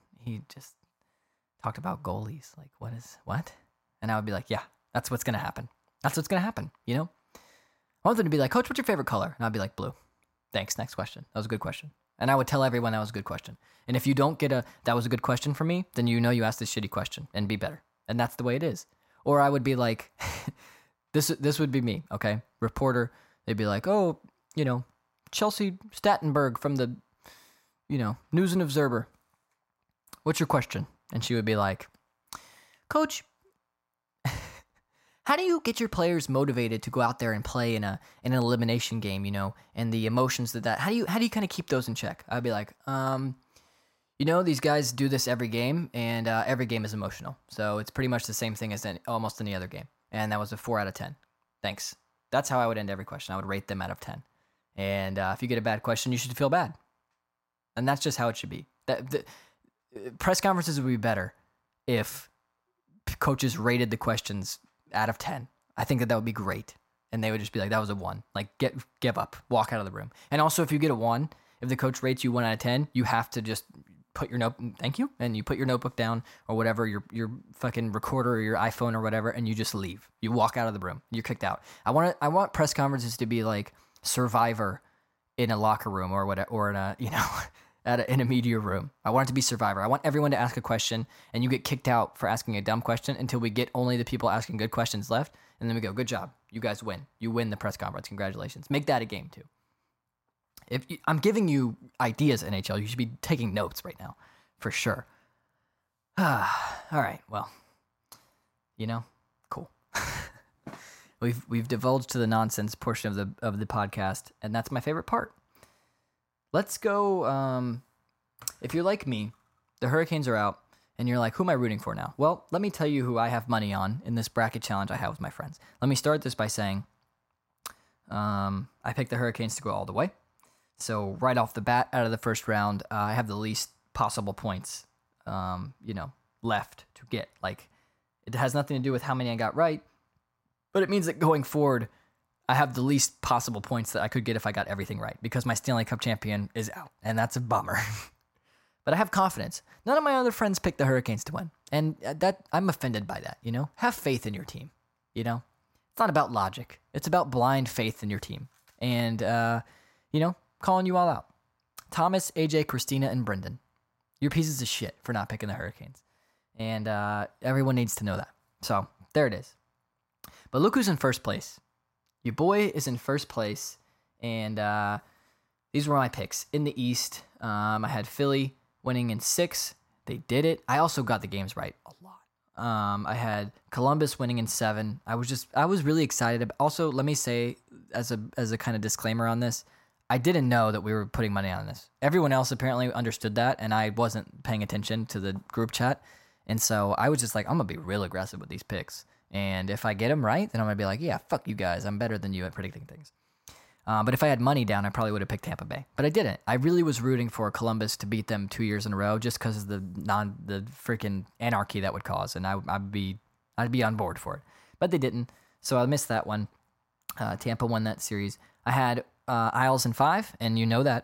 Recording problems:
none

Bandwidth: 16 kHz